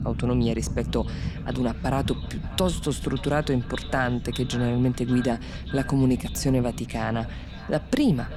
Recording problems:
echo of what is said; noticeable; throughout; 580 ms later, 15 dB below the speech
low rumble; noticeable; throughout; 15 dB below the speech
murmuring crowd; faint; throughout; 30 dB below the speech

